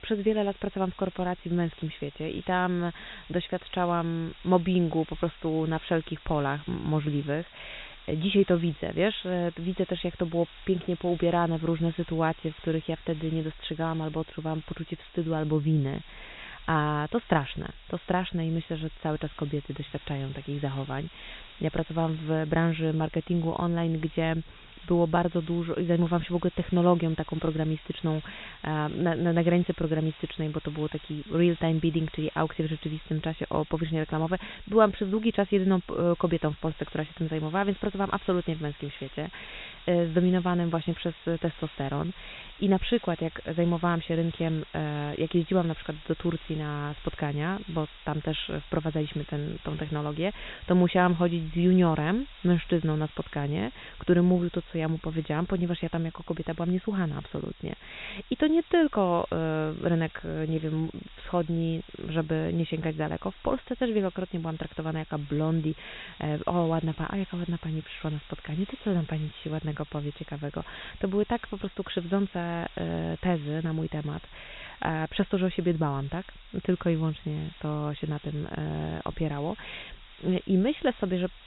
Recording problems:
high frequencies cut off; severe; nothing above 4 kHz
hiss; faint; throughout; 20 dB below the speech

